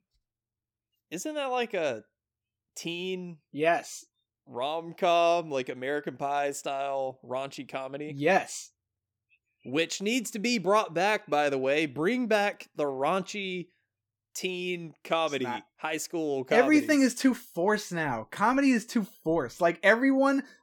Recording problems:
none

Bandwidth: 18.5 kHz